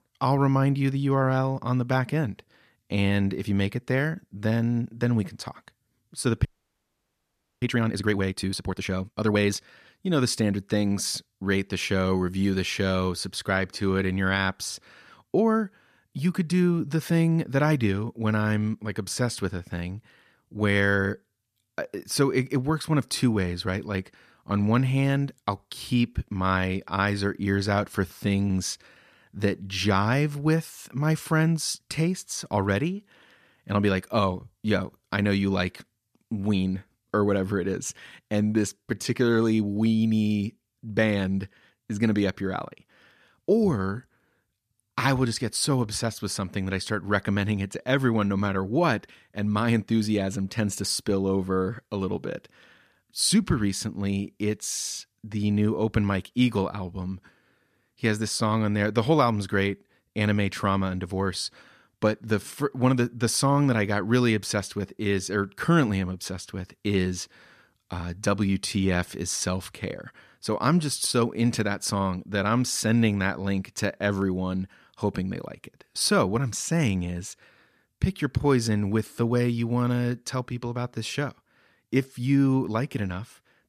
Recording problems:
audio freezing; at 6.5 s for 1 s

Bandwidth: 14.5 kHz